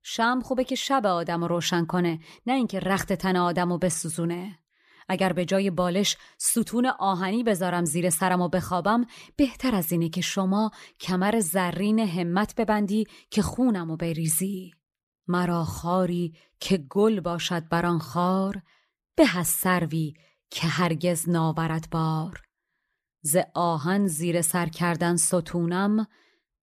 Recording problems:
none

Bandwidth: 14.5 kHz